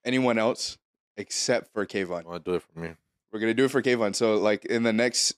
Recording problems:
none

